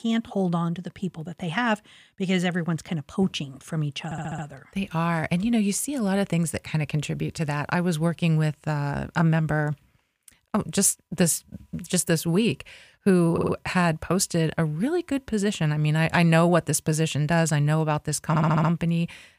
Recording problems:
audio stuttering; at 4 s, at 13 s and at 18 s

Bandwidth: 15 kHz